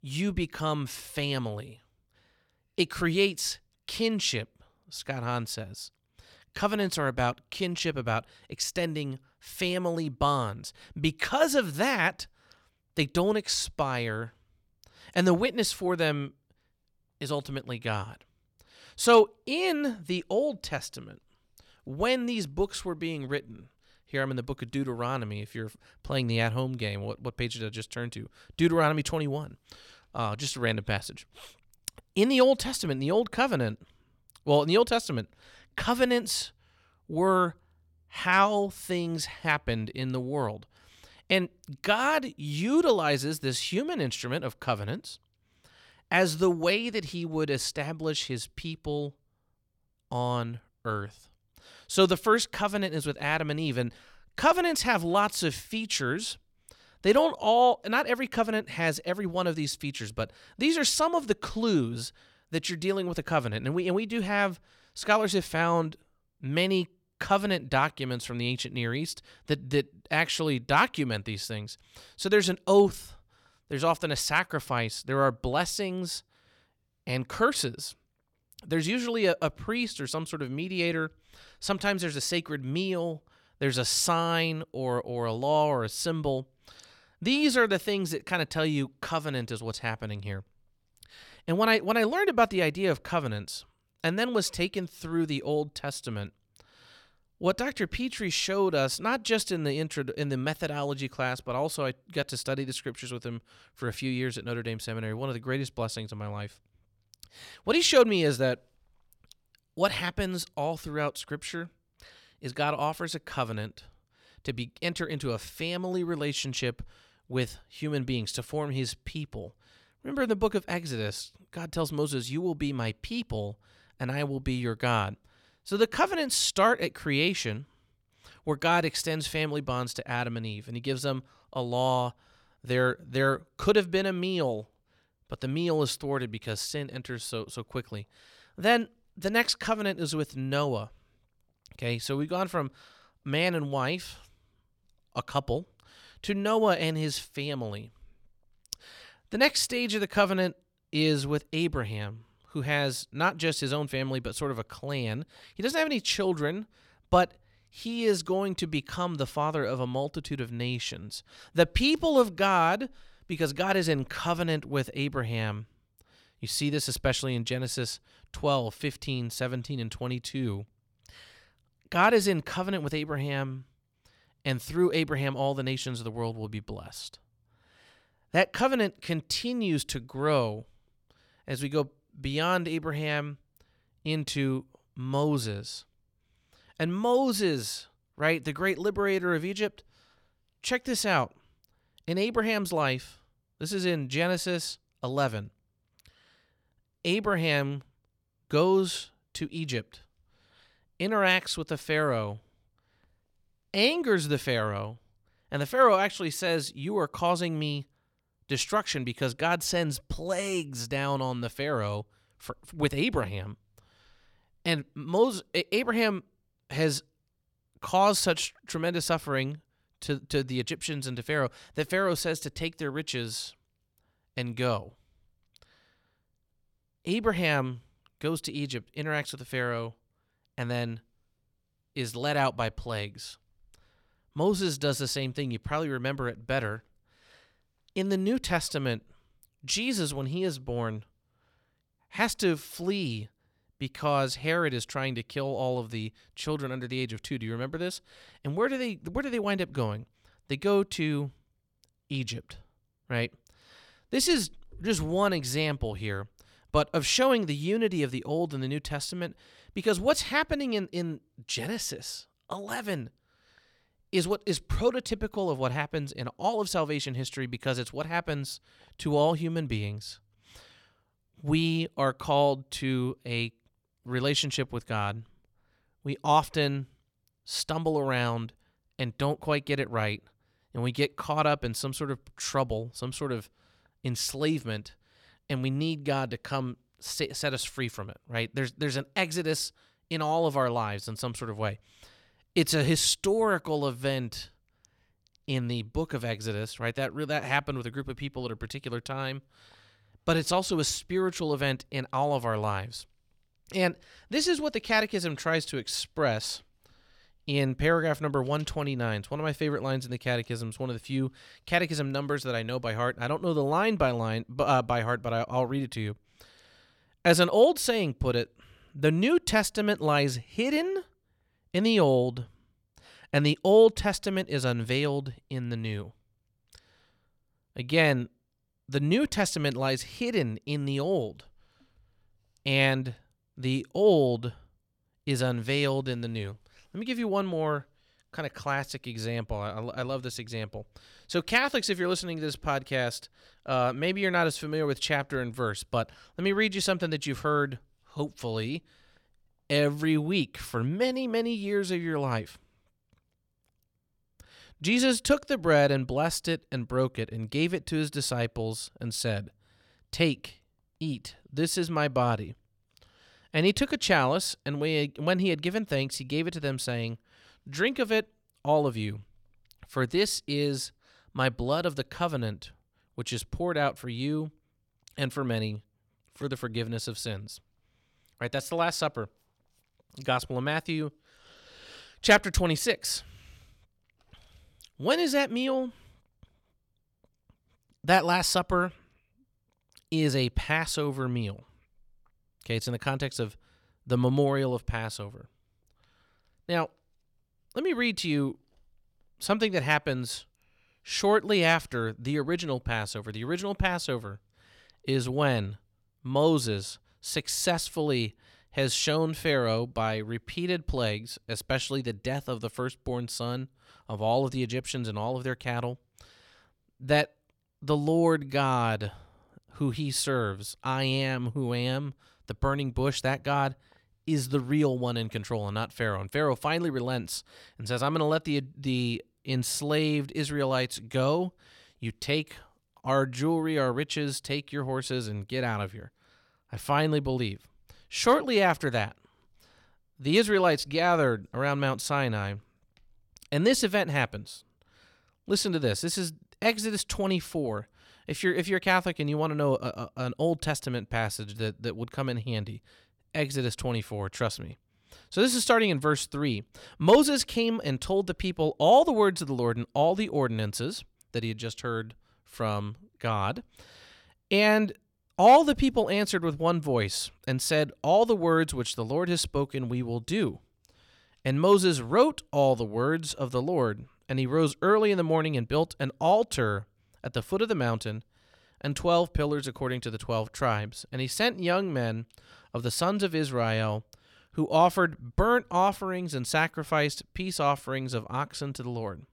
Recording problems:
none

